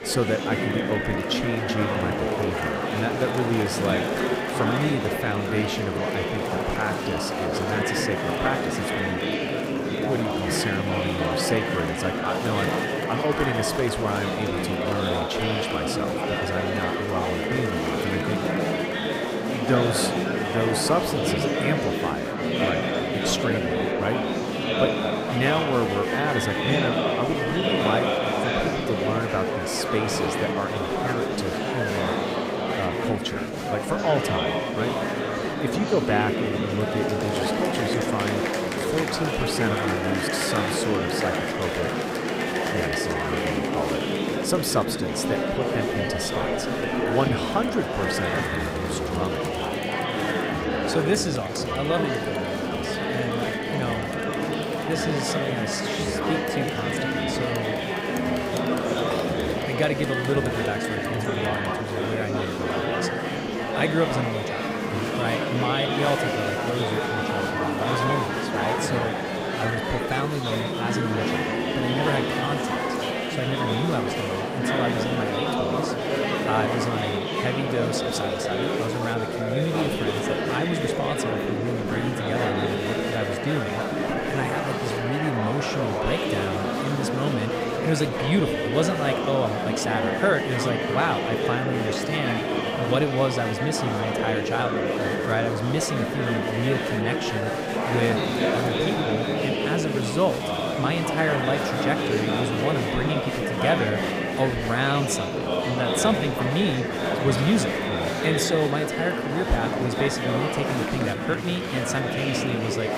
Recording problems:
murmuring crowd; very loud; throughout; 3 dB above the speech

